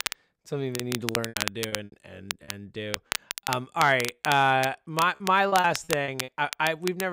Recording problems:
crackle, like an old record; loud; 8 dB below the speech
choppy; very; from 1 to 3.5 s and at 5.5 s; 15% of the speech affected
abrupt cut into speech; at the end

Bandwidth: 15.5 kHz